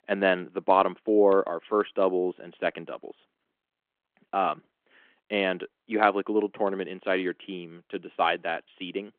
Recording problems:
phone-call audio

